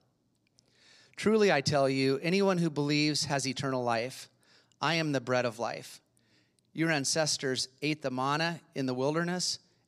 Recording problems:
none

